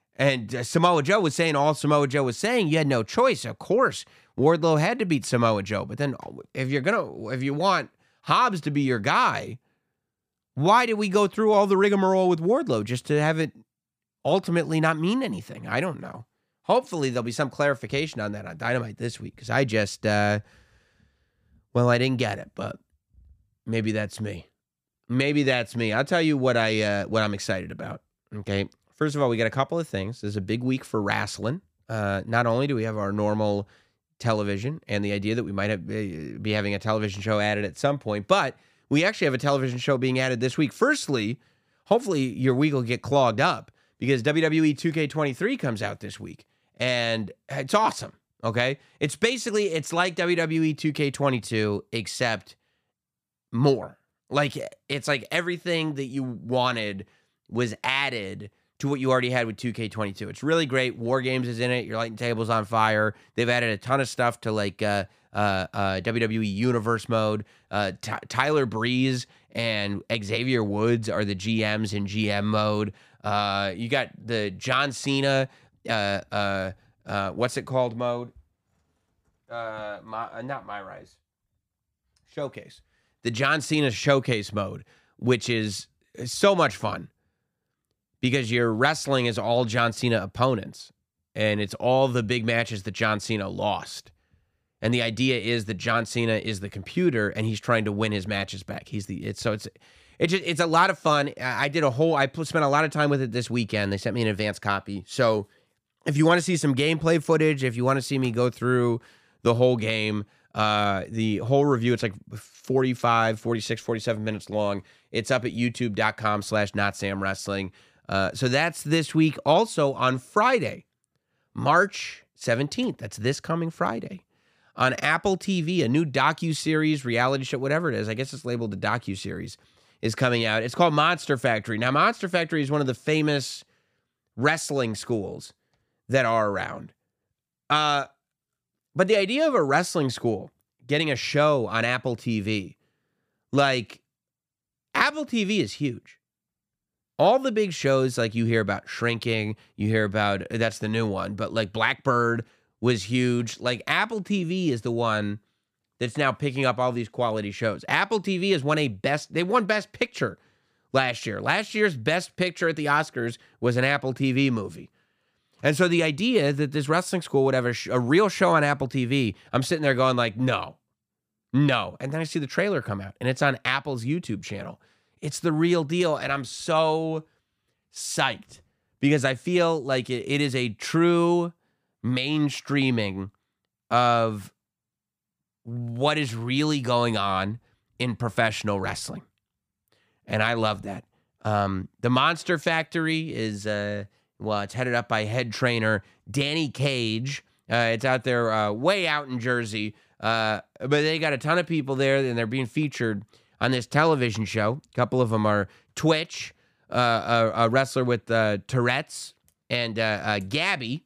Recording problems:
none

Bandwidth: 15 kHz